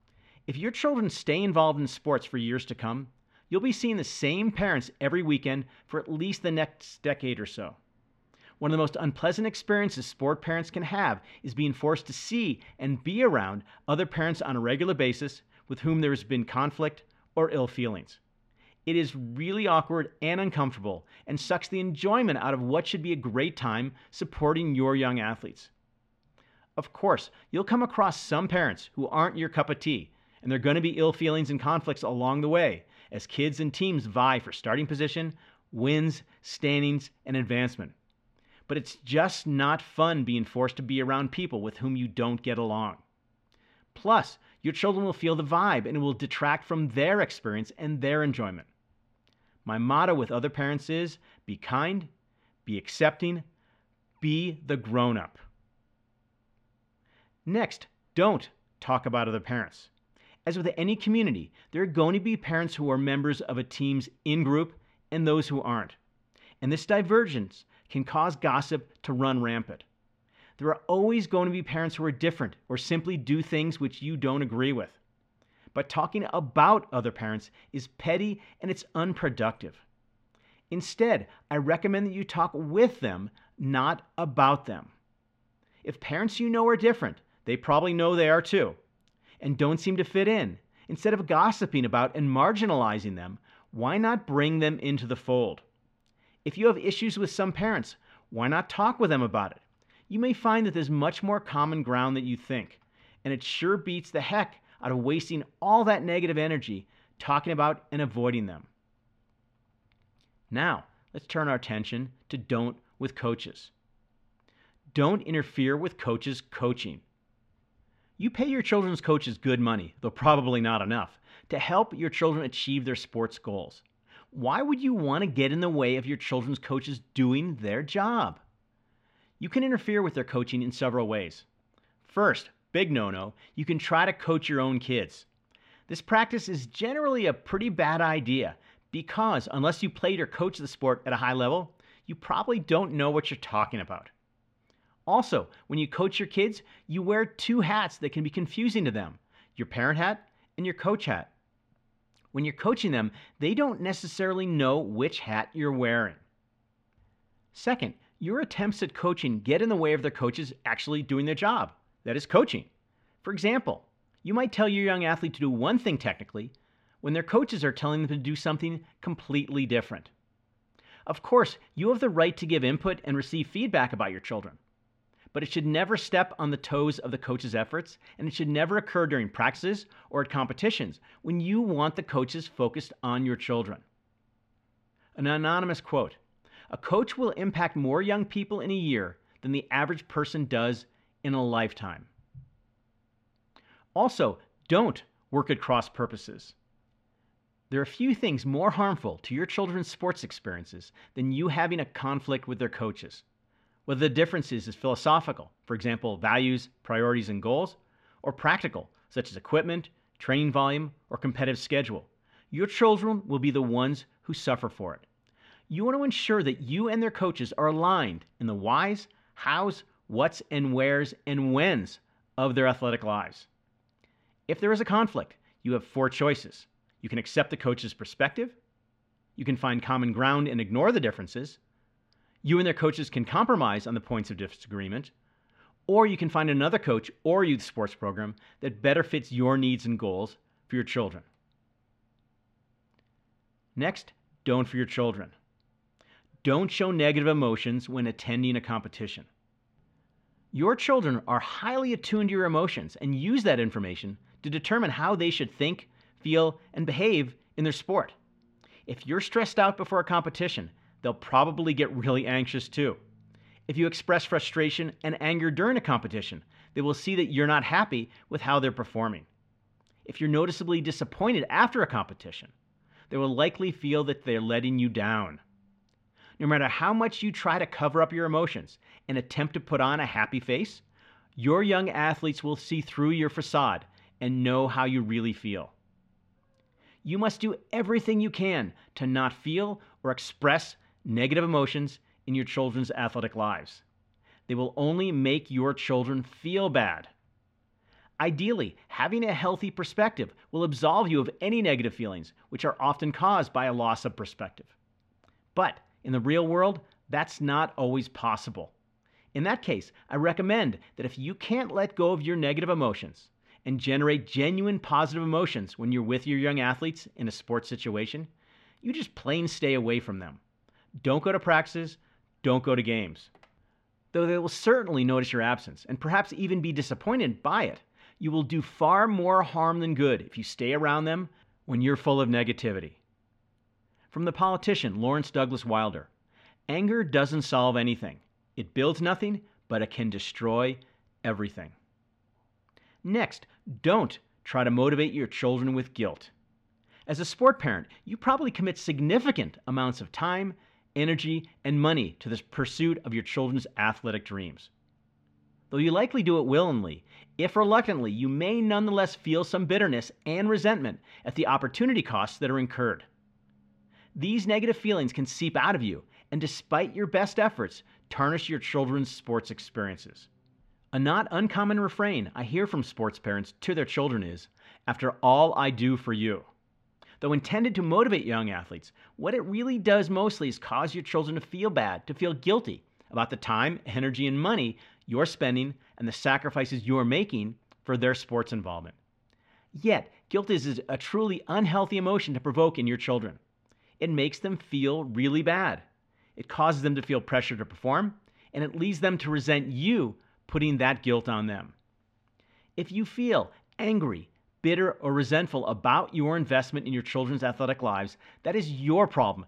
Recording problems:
muffled; slightly; fading above 3 kHz

